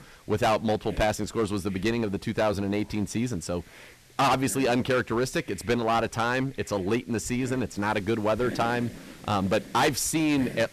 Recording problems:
distortion; heavy; 9% of the sound clipped
hiss; noticeable; throughout; 20 dB below the speech

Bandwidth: 14 kHz